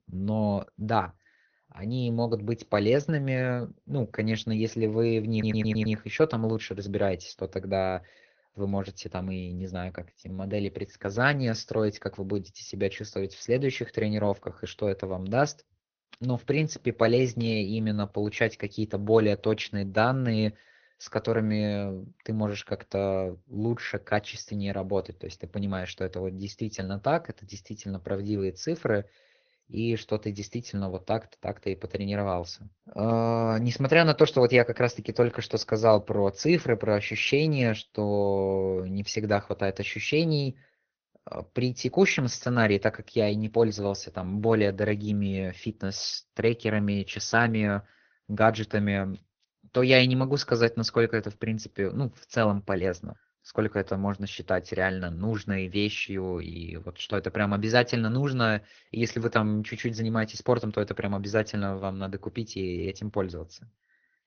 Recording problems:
high frequencies cut off; noticeable; nothing above 6.5 kHz
garbled, watery; slightly
audio stuttering; at 5.5 s

